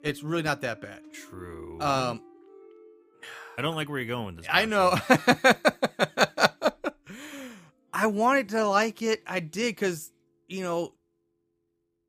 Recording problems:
background music; faint; throughout; 25 dB below the speech

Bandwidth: 15 kHz